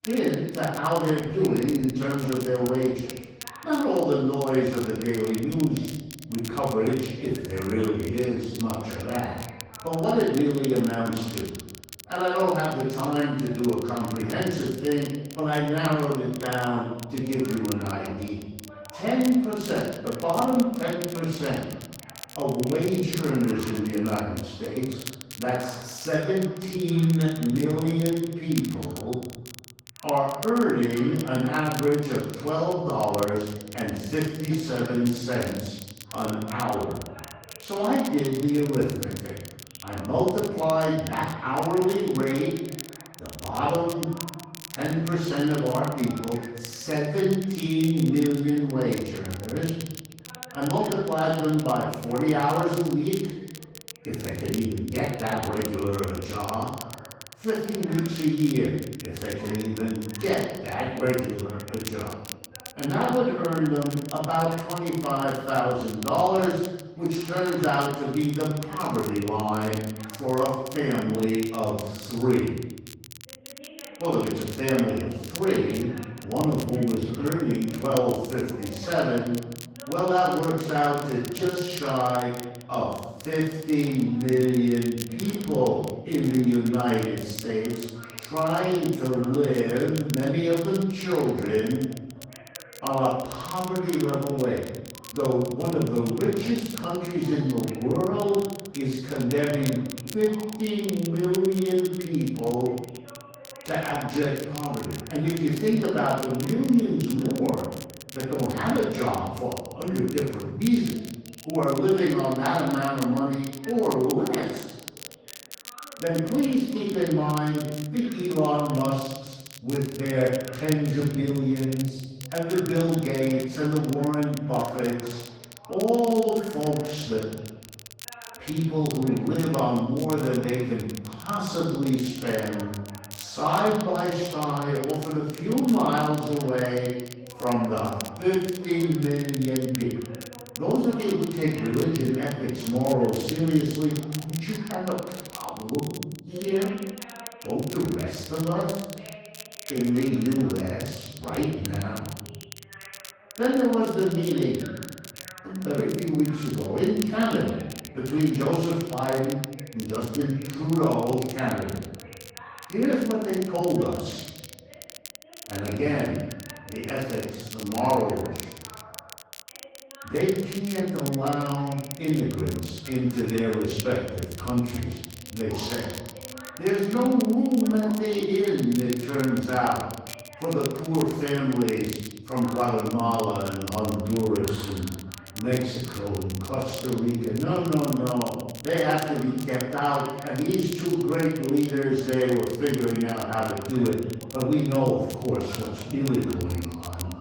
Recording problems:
room echo; strong; dies away in 1 s
off-mic speech; far
garbled, watery; slightly; nothing above 18 kHz
crackle, like an old record; noticeable; 15 dB below the speech
voice in the background; faint; throughout; 20 dB below the speech

